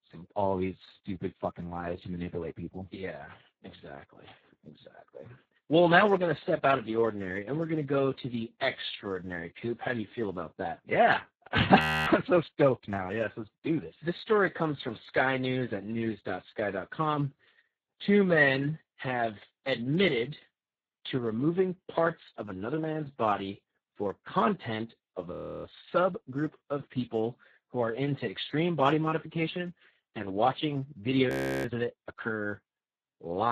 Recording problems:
garbled, watery; badly; nothing above 14.5 kHz
audio freezing; at 12 s, at 25 s and at 31 s
abrupt cut into speech; at the end

